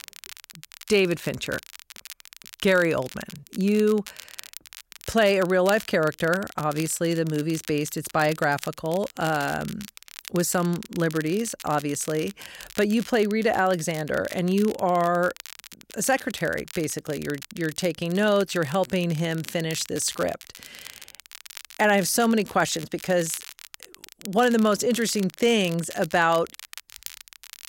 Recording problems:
crackle, like an old record; noticeable; 15 dB below the speech

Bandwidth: 16 kHz